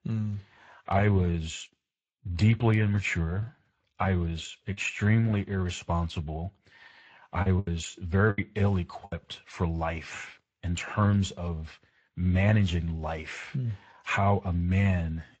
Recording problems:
garbled, watery; slightly; nothing above 7.5 kHz
choppy; very; from 2.5 to 5 s and from 7.5 to 9 s; 5% of the speech affected

